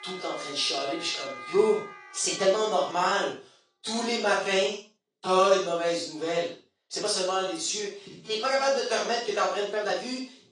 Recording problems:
off-mic speech; far
room echo; noticeable; dies away in 0.4 s
thin; somewhat; fading below 450 Hz
garbled, watery; slightly; nothing above 9 kHz
background music; noticeable; until 3 s; 15 dB below the speech
uneven, jittery; strongly; from 0.5 to 10 s

